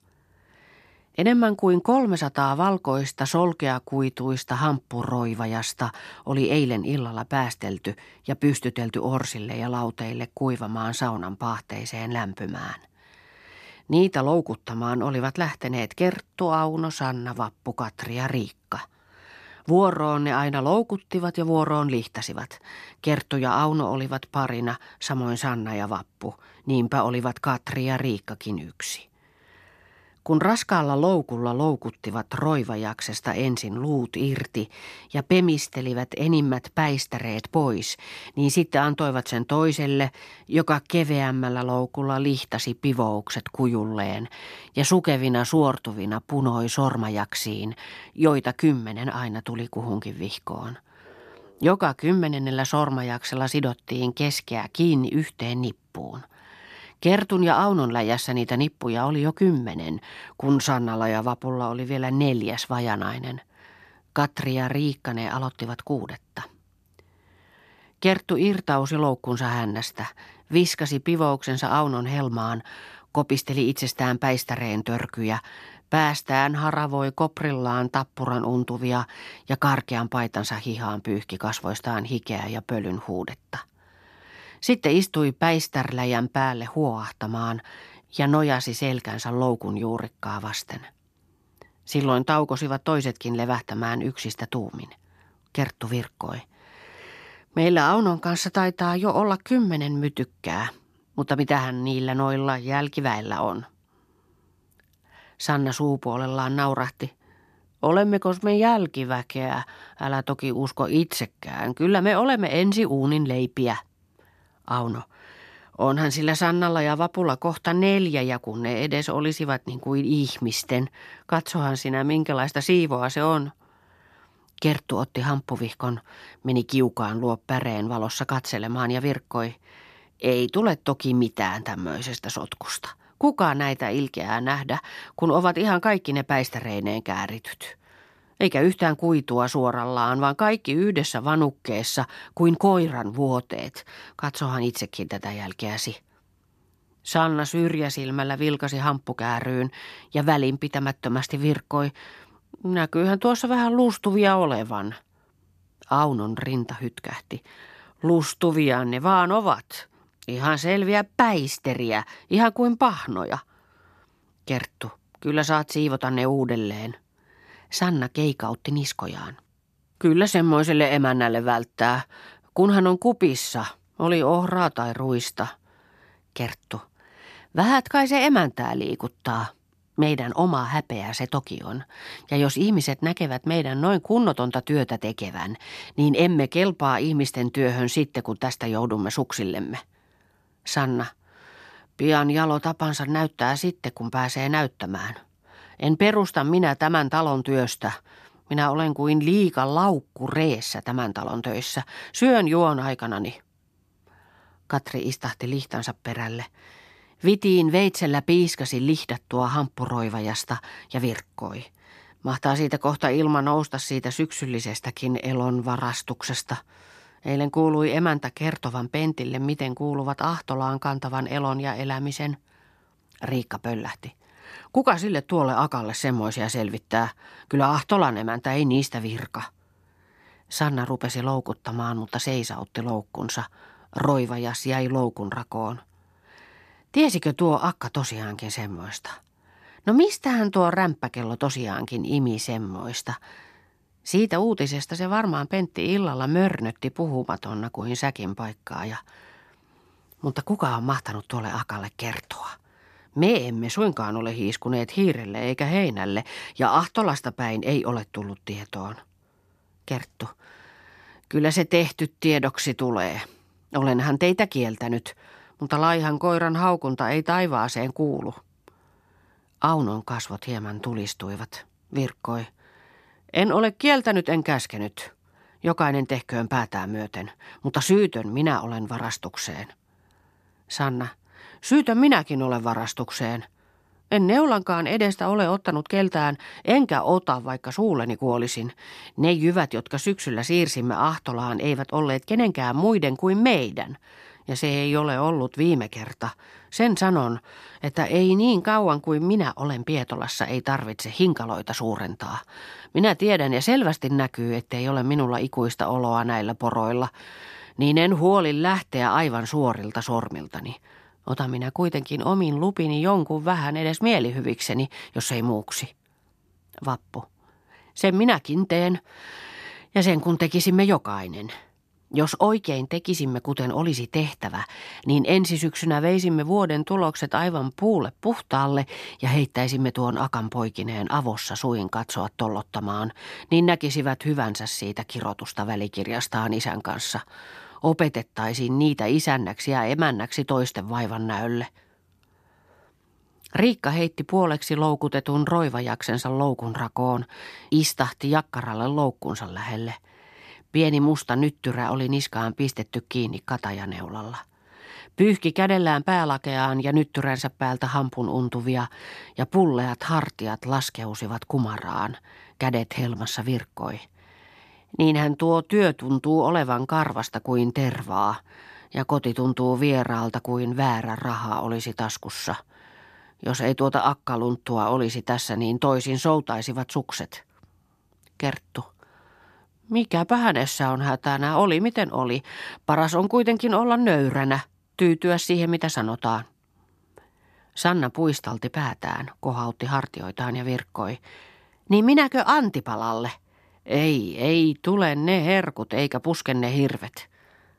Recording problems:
none

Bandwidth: 14 kHz